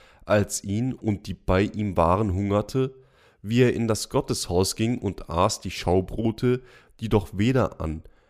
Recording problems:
none

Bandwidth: 15 kHz